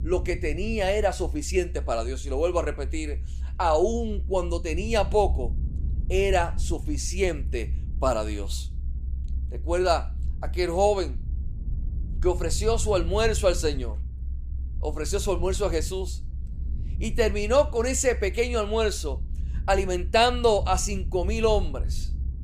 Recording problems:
low rumble; faint; throughout; 25 dB below the speech

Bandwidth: 15 kHz